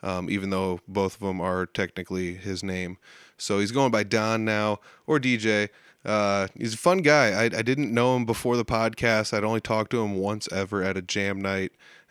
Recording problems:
none

